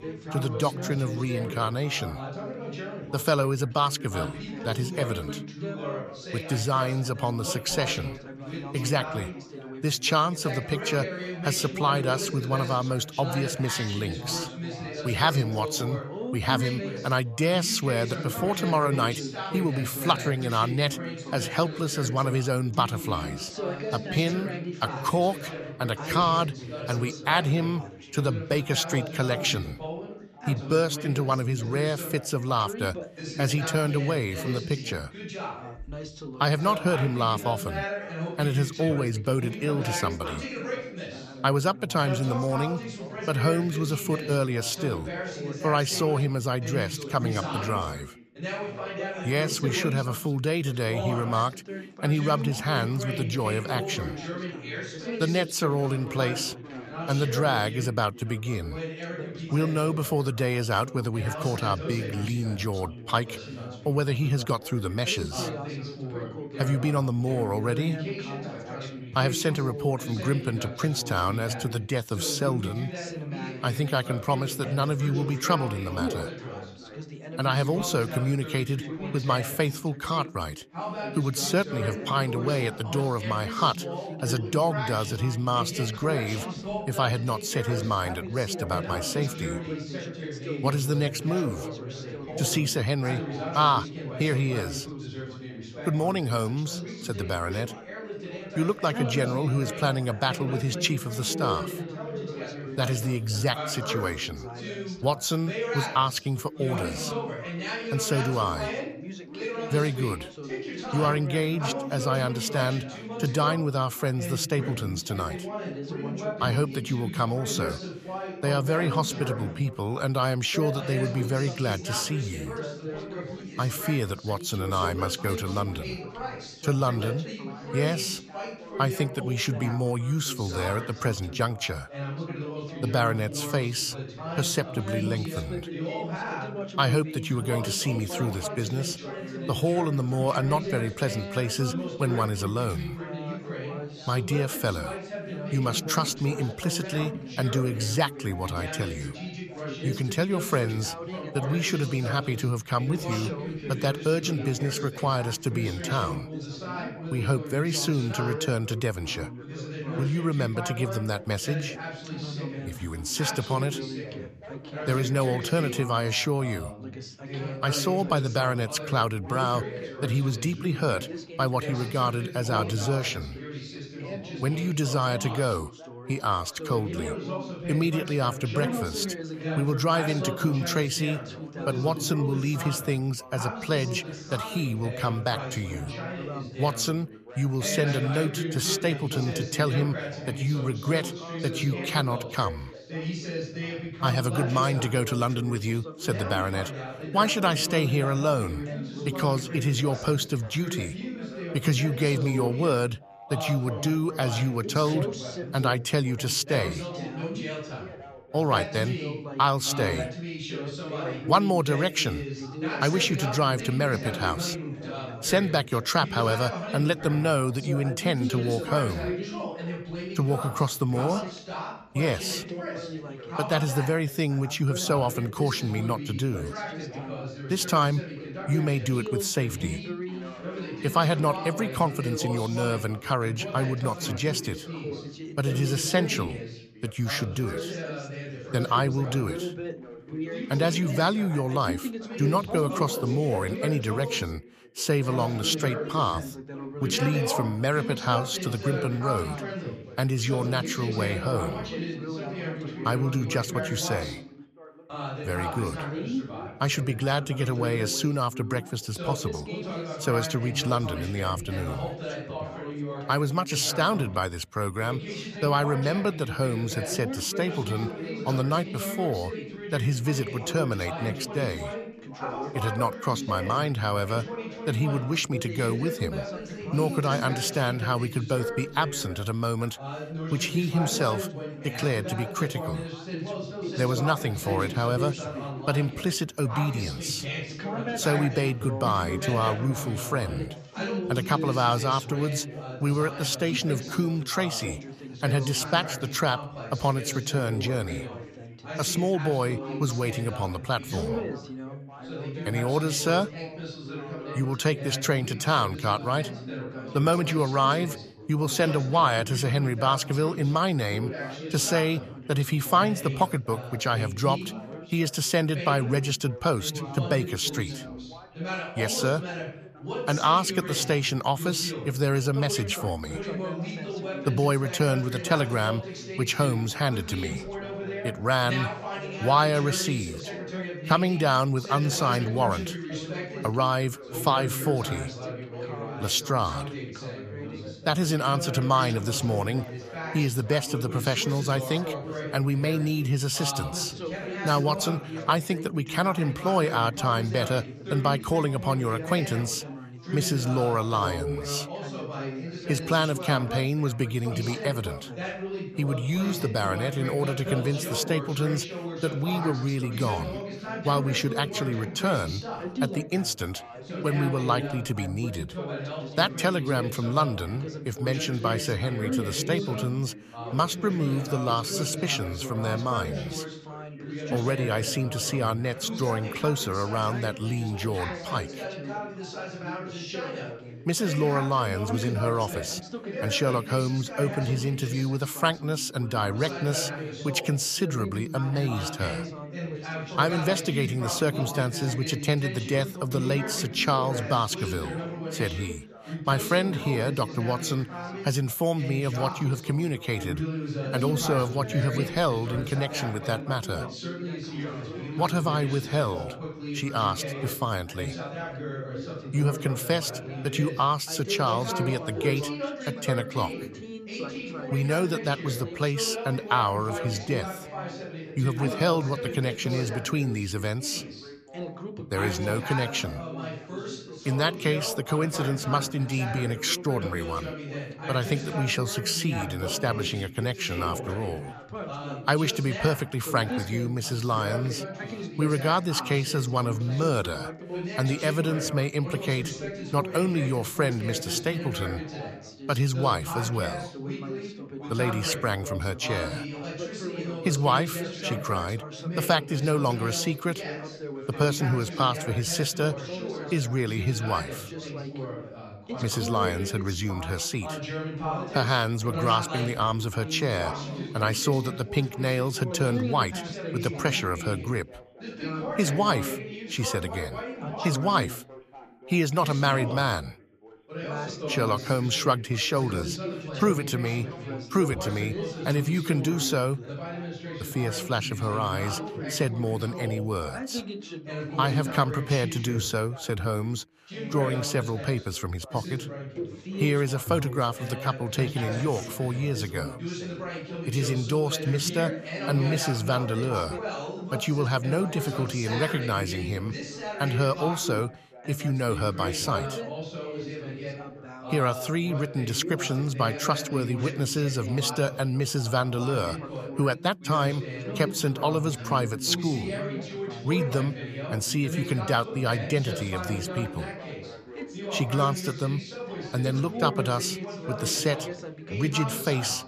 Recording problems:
background chatter; loud; throughout; 3 voices, 8 dB below the speech

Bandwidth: 14.5 kHz